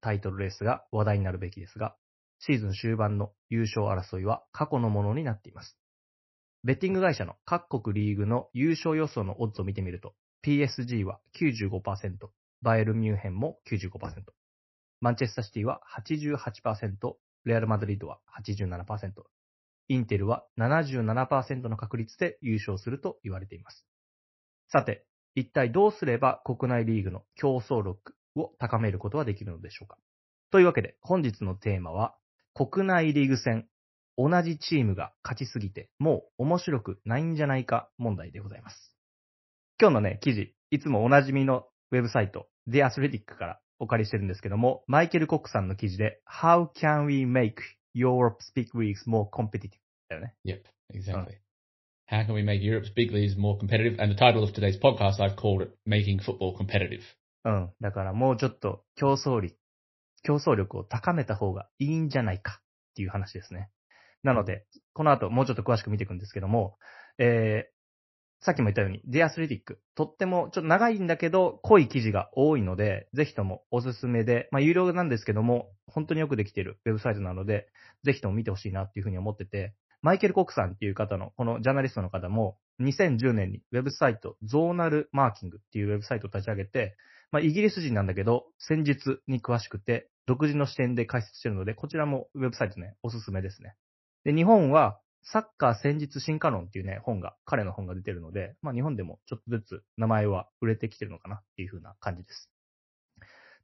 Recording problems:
garbled, watery; slightly; nothing above 5.5 kHz

